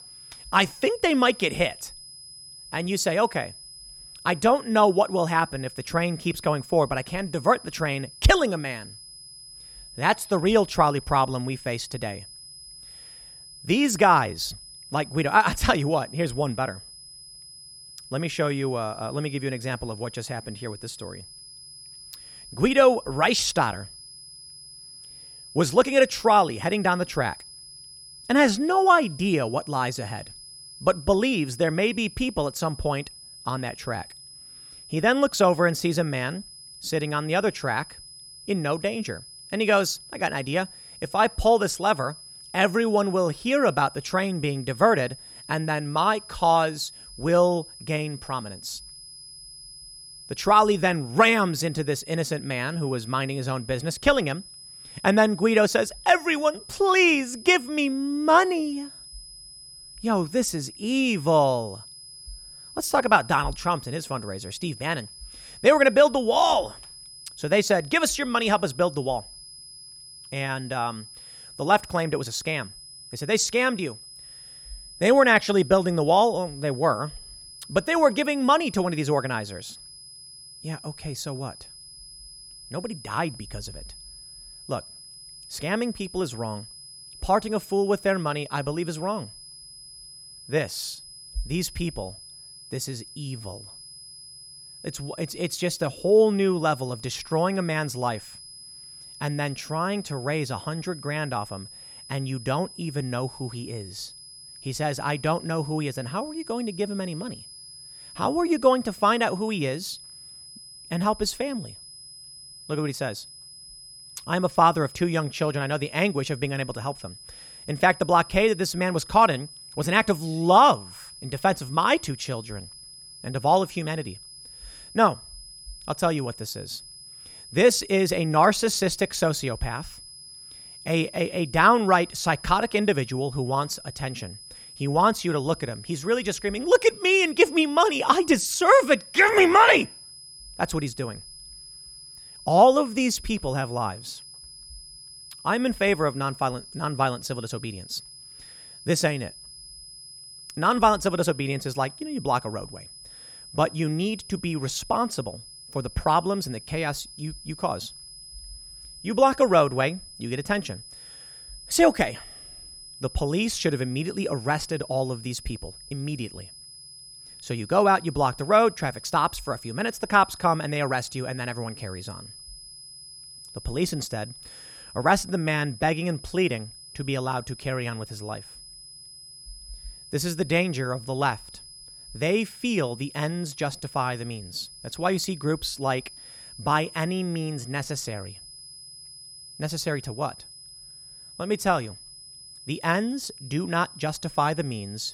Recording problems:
high-pitched whine; noticeable; throughout; 5 kHz, 20 dB below the speech

